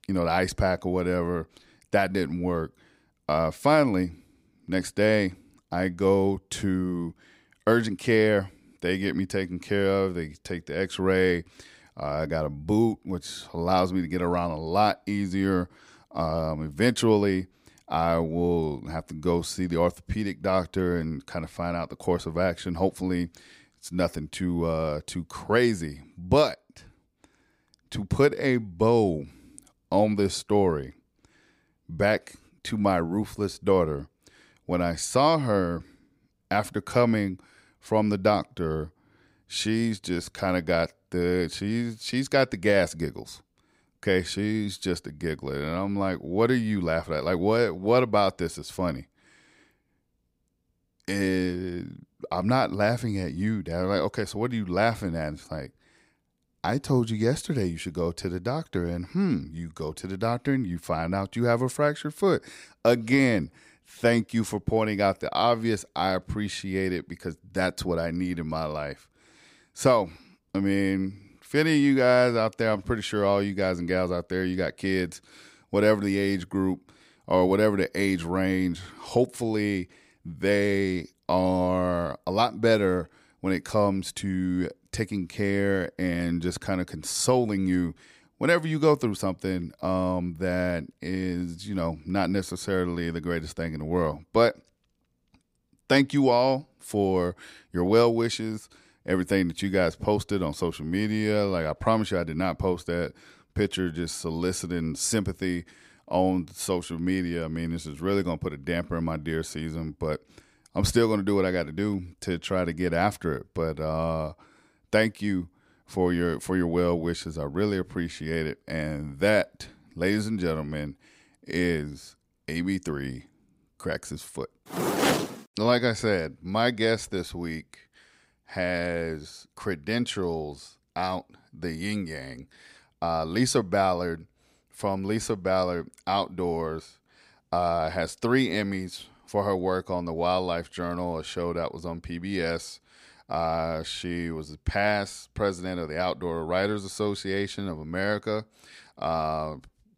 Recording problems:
none

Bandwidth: 15.5 kHz